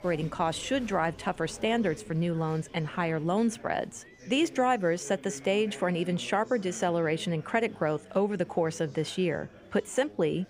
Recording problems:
chatter from many people; noticeable; throughout; 20 dB below the speech

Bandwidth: 15.5 kHz